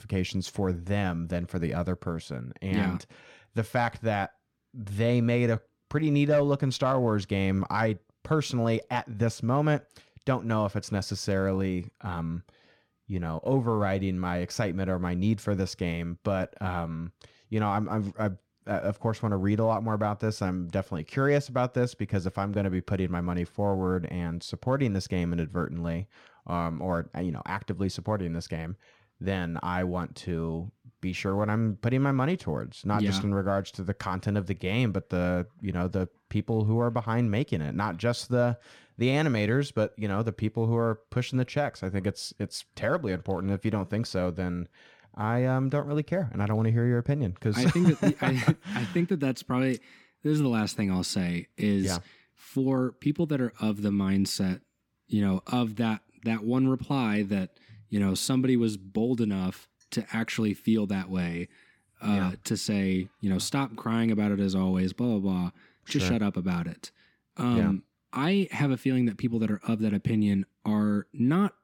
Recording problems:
none

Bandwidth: 17 kHz